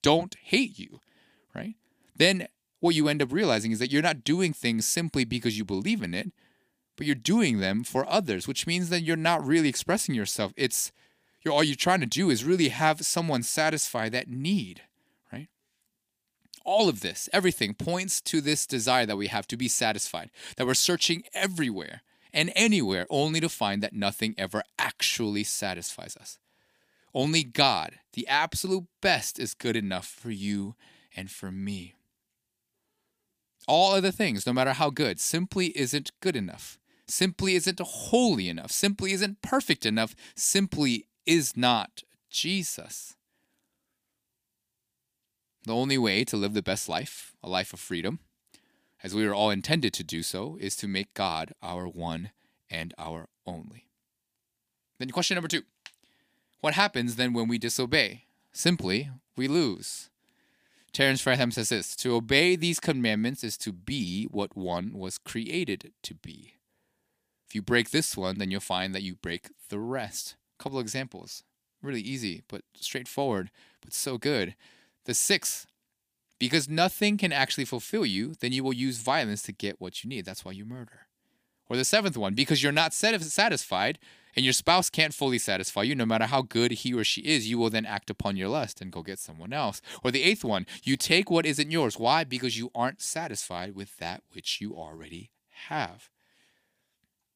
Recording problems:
none

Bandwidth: 15 kHz